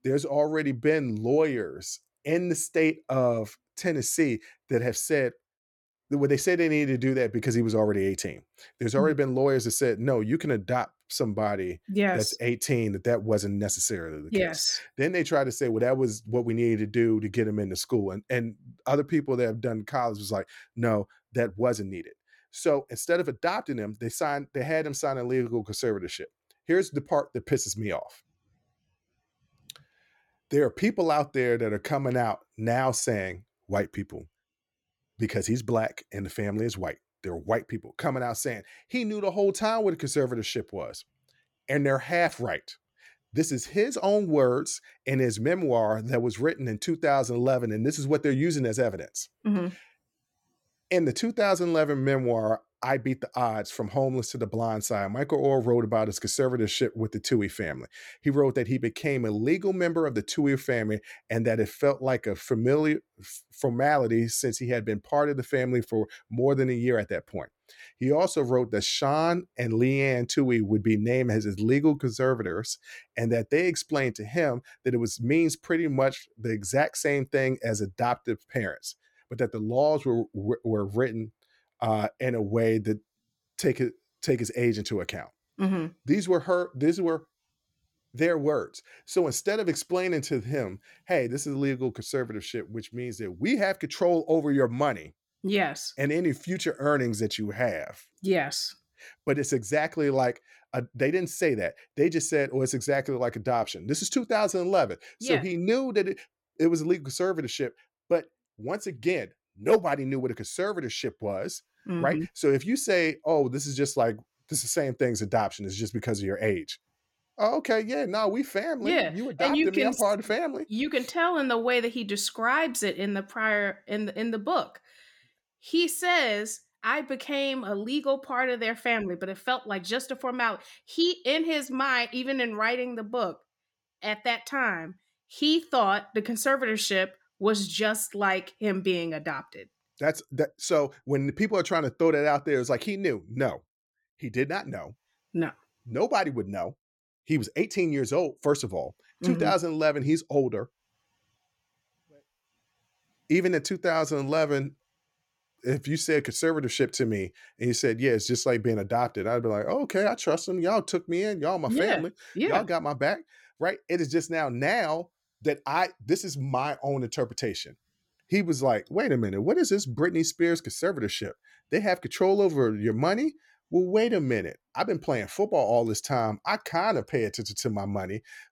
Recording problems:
none

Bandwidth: 17.5 kHz